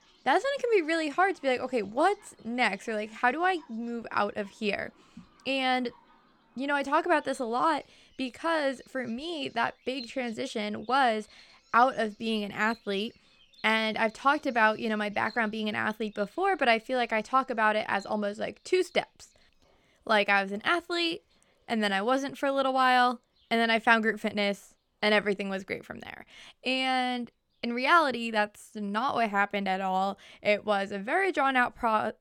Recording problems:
animal sounds; faint; throughout; 30 dB below the speech

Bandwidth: 17.5 kHz